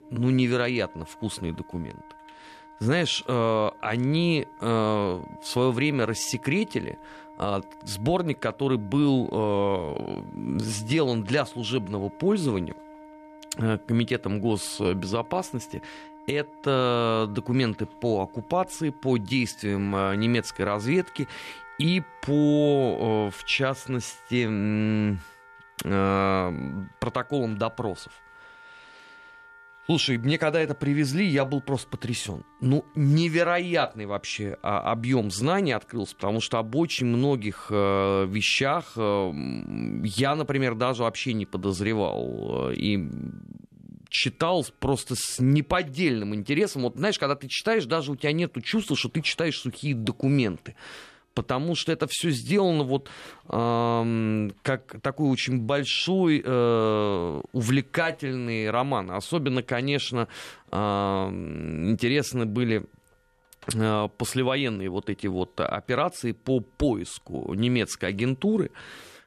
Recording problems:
background music; faint; throughout; 20 dB below the speech

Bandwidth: 13.5 kHz